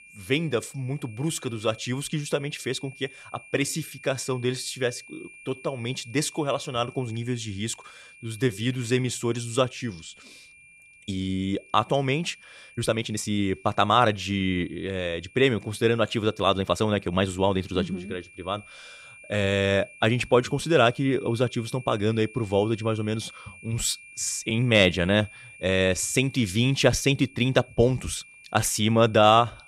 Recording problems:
high-pitched whine; faint; throughout; 2.5 kHz, 20 dB below the speech
uneven, jittery; strongly; from 3.5 to 29 s

